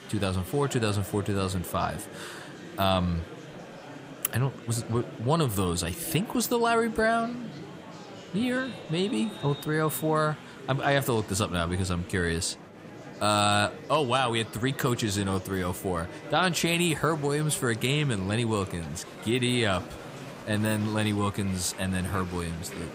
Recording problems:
murmuring crowd; noticeable; throughout; 15 dB below the speech

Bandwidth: 15.5 kHz